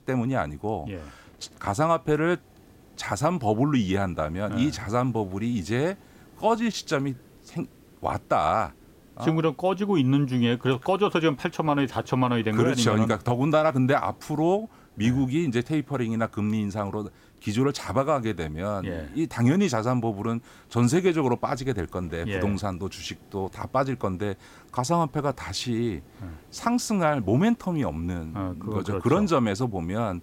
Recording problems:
hiss; faint; throughout; 30 dB below the speech

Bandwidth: 16 kHz